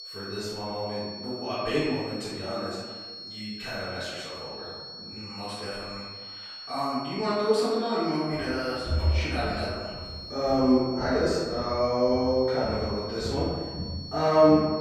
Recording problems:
room echo; strong; dies away in 1.3 s
off-mic speech; far
high-pitched whine; noticeable; throughout; 4.5 kHz, 10 dB below the speech
footsteps; loud; from 8.5 s on; peak 1 dB above the speech

